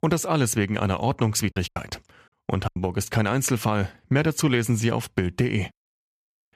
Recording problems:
choppy; very; from 1.5 to 3 s; 6% of the speech affected

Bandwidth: 14.5 kHz